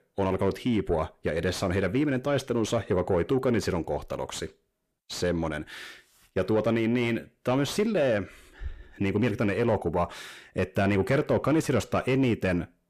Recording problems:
distortion; slight; 10 dB below the speech

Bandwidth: 14.5 kHz